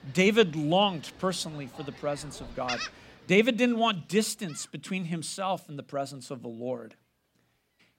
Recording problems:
animal sounds; noticeable; throughout; 15 dB below the speech

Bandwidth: 16 kHz